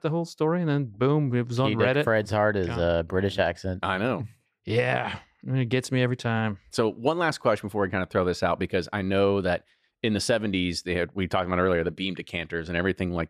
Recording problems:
none

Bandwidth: 14.5 kHz